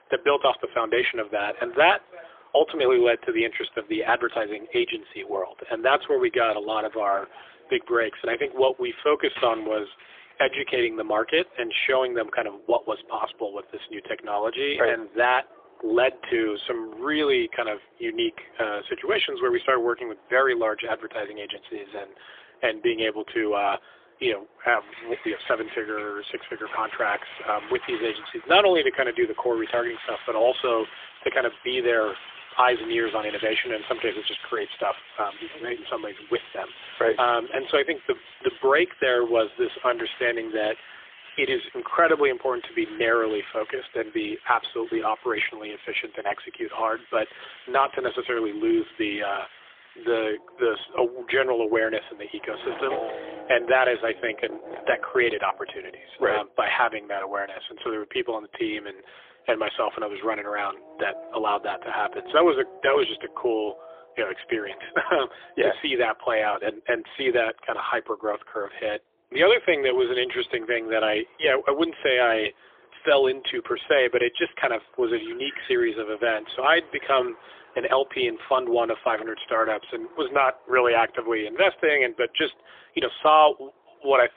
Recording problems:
phone-call audio; poor line; nothing above 3.5 kHz
traffic noise; noticeable; throughout; 20 dB below the speech

